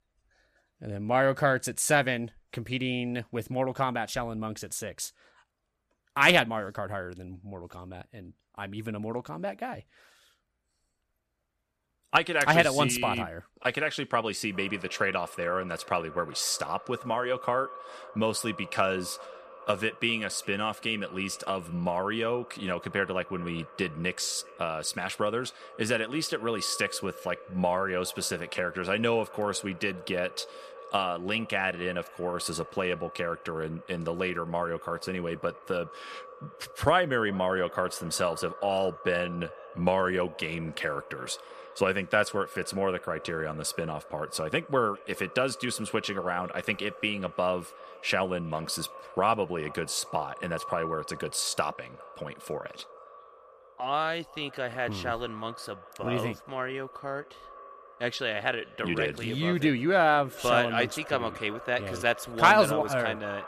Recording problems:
echo of what is said; noticeable; from 14 s on; 400 ms later, 15 dB below the speech

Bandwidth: 14.5 kHz